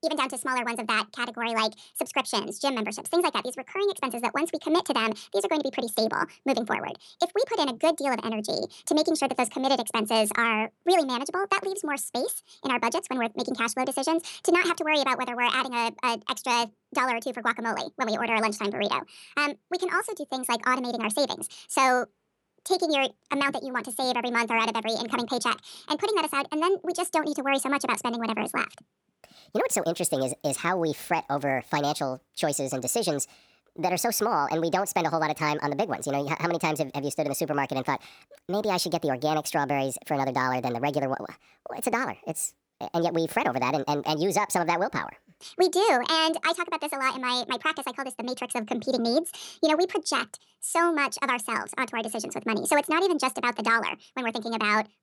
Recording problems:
wrong speed and pitch; too fast and too high; 1.6 times normal speed

